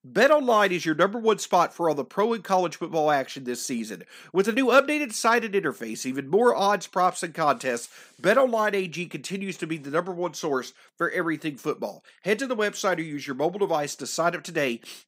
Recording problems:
none

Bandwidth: 15.5 kHz